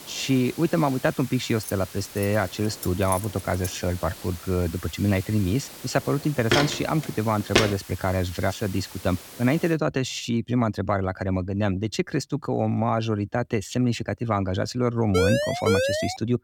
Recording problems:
hiss; noticeable; until 9.5 s; 15 dB below the speech
jangling keys; noticeable; from 1.5 to 3.5 s; peak 8 dB below the speech
footsteps; loud; from 6.5 to 7.5 s; peak 3 dB above the speech
siren; loud; from 15 s on; peak 2 dB above the speech

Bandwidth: 18 kHz